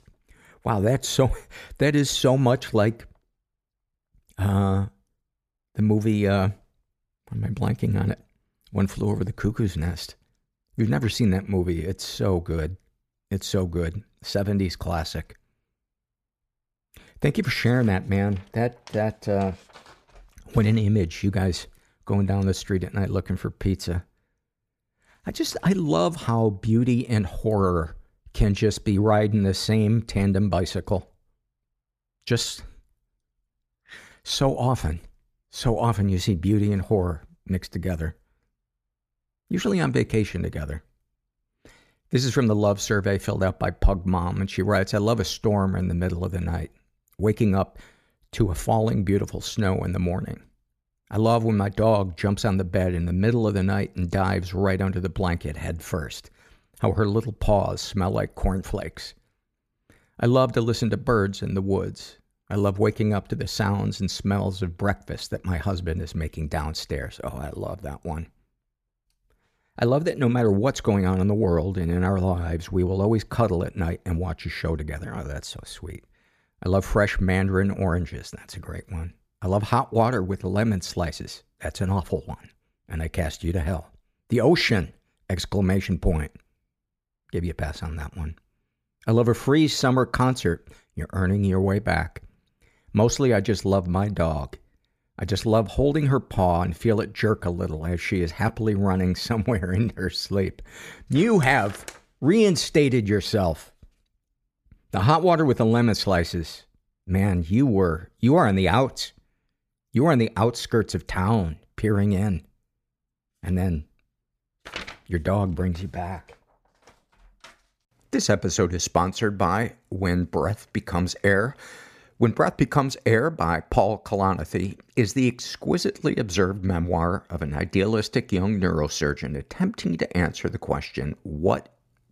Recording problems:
none

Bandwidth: 14.5 kHz